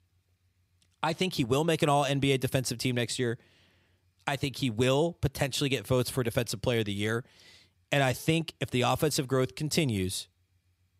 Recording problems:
none

